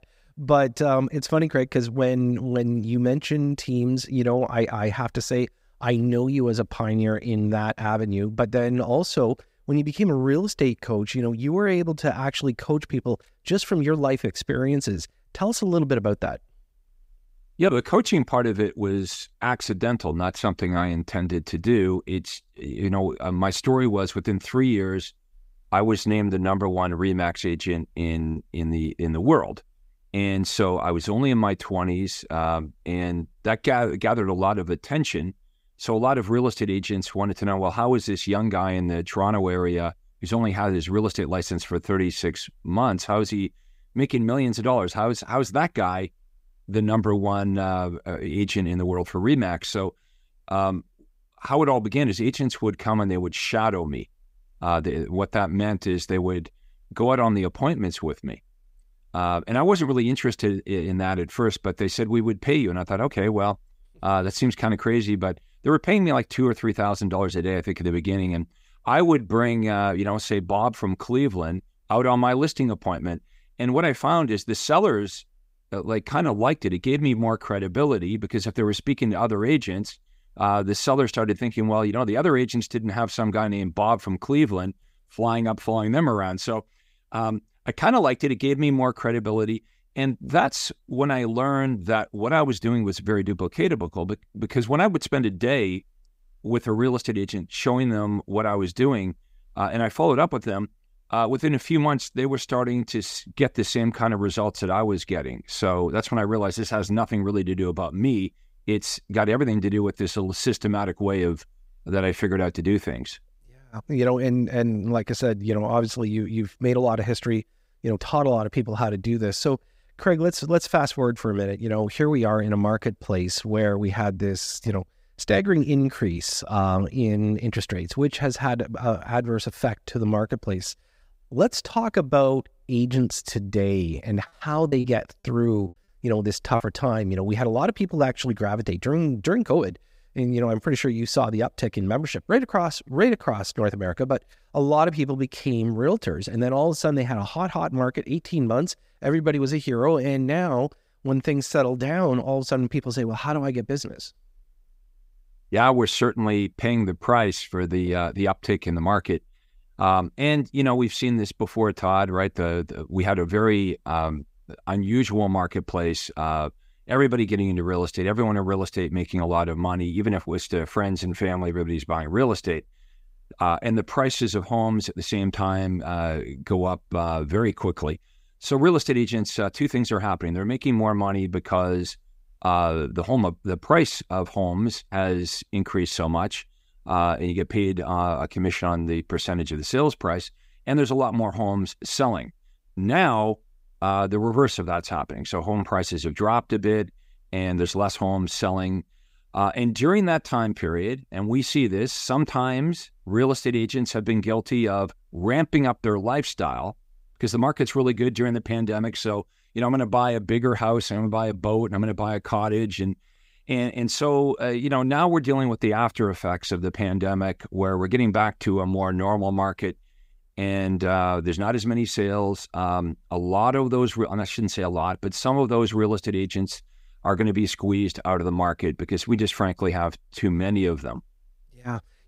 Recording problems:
choppy; occasionally; at 28 s and from 2:15 to 2:17; 4% of the speech affected

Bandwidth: 15.5 kHz